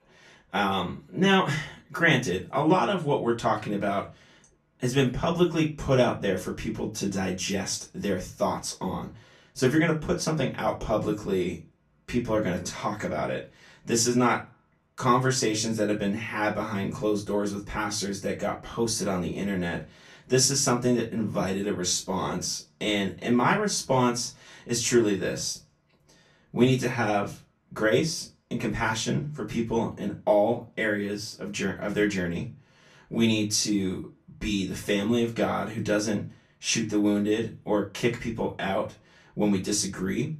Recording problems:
off-mic speech; far
room echo; very slight; dies away in 0.2 s

